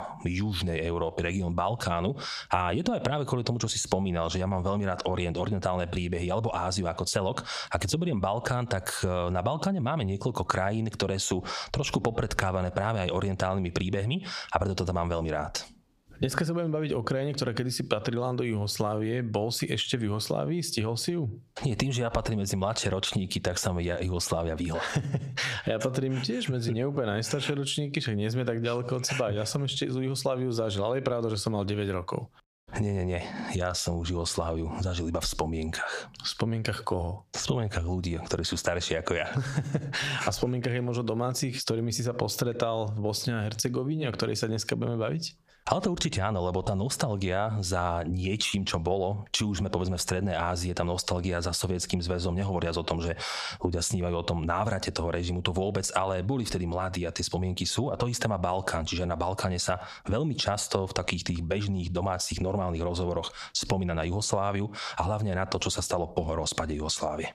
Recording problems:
squashed, flat; heavily

